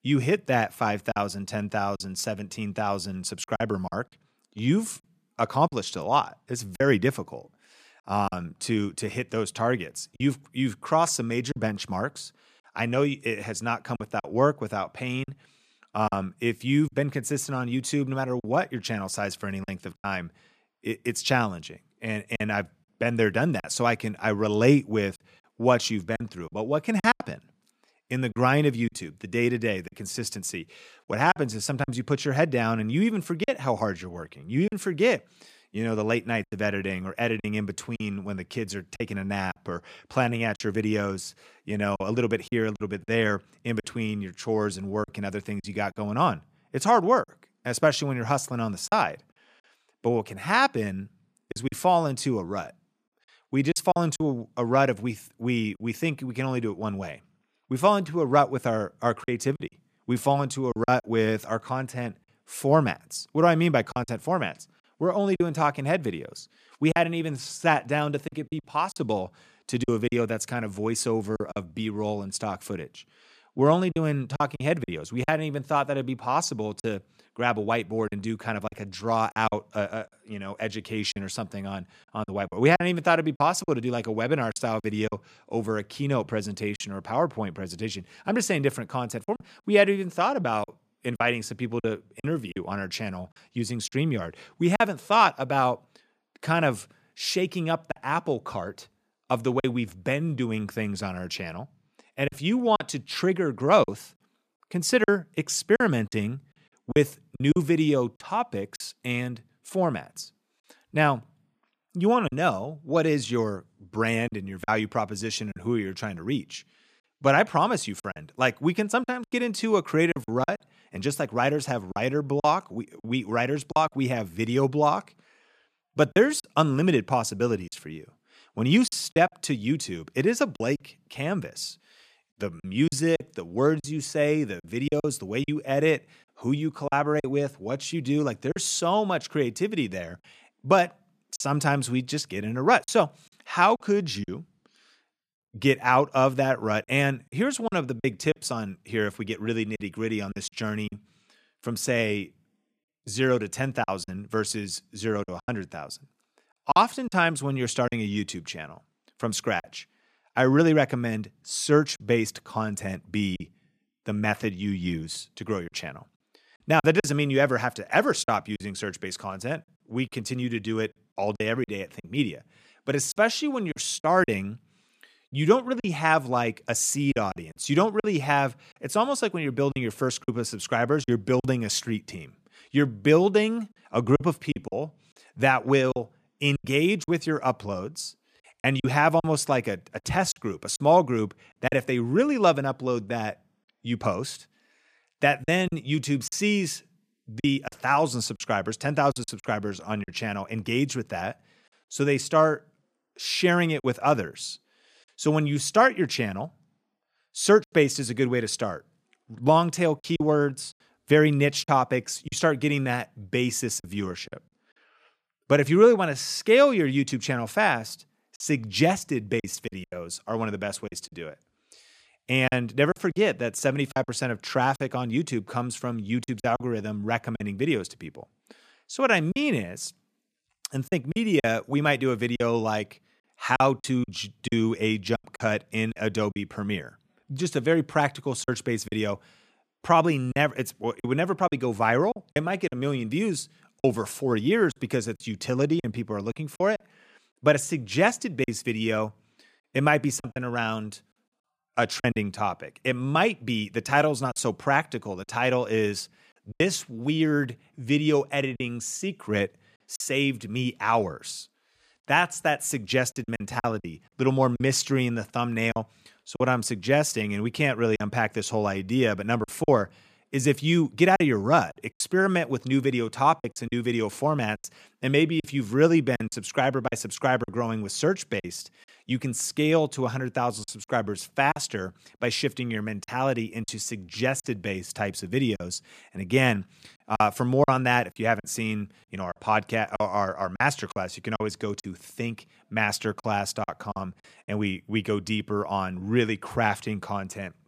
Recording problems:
choppy; very; 6% of the speech affected

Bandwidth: 14.5 kHz